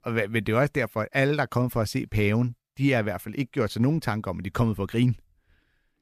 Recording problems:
none

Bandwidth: 14.5 kHz